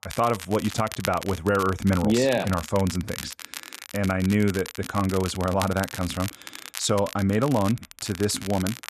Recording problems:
crackle, like an old record; noticeable; 10 dB below the speech

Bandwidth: 13.5 kHz